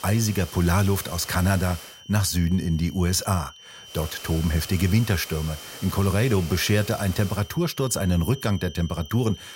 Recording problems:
high-pitched whine; noticeable; throughout; 3 kHz, 20 dB below the speech
hiss; noticeable; until 2 s and from 4 to 7.5 s; 15 dB below the speech

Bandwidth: 16 kHz